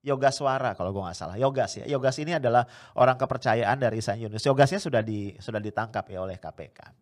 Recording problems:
none

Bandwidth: 14.5 kHz